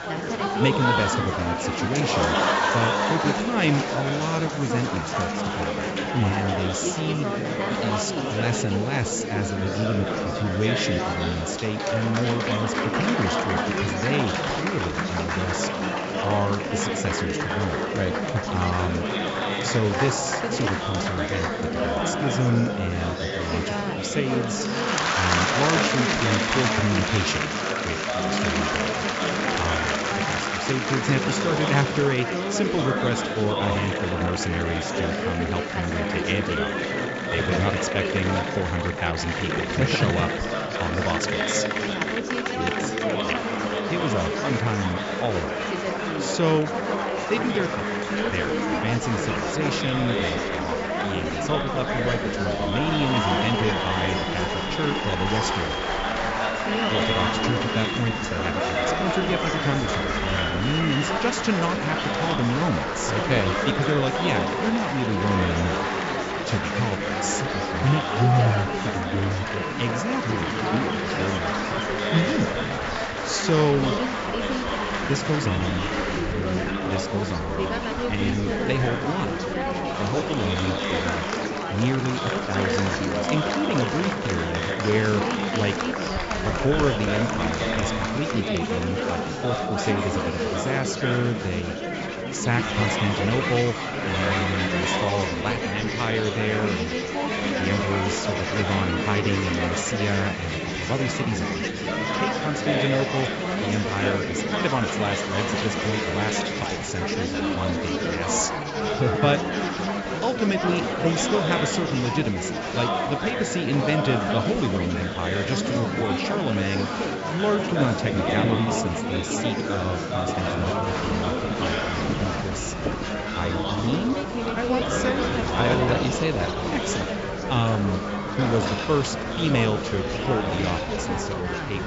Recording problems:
high frequencies cut off; noticeable; nothing above 7.5 kHz
chatter from many people; very loud; throughout; 2 dB above the speech
animal sounds; noticeable; throughout; 15 dB below the speech

